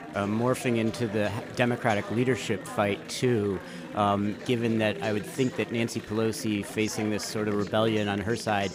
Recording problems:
chatter from many people; noticeable; throughout; 10 dB below the speech

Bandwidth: 15.5 kHz